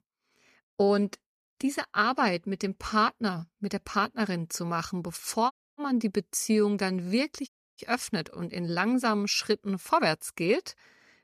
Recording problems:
audio cutting out; at 5.5 s and at 7.5 s

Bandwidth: 14.5 kHz